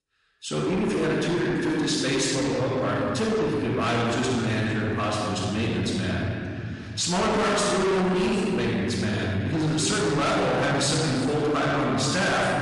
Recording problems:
distortion; heavy; 6 dB below the speech
room echo; strong; dies away in 3 s
off-mic speech; far
garbled, watery; slightly; nothing above 10.5 kHz

